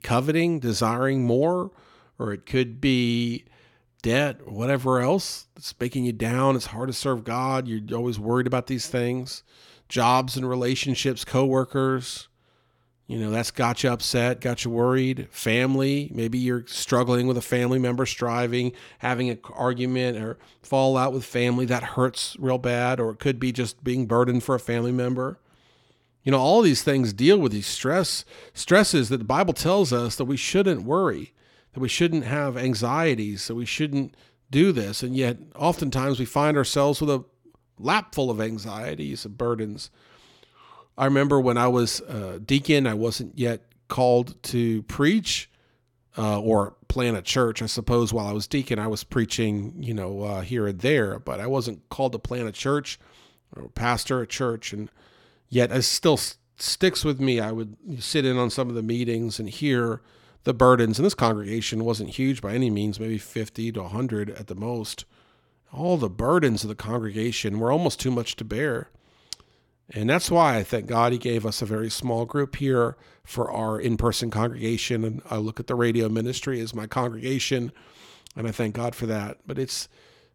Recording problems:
none

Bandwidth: 17 kHz